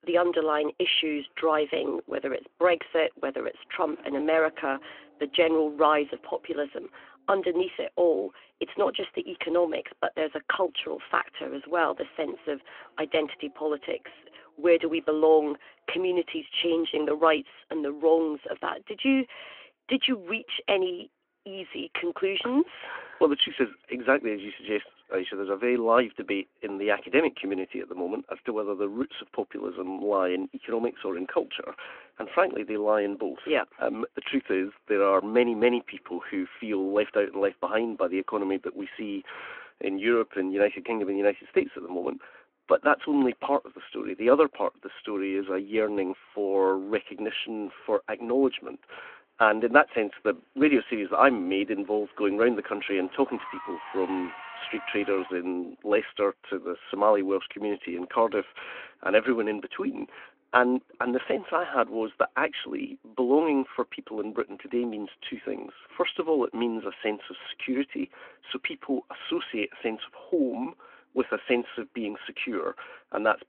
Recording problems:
phone-call audio
traffic noise; faint; throughout; 20 dB below the speech

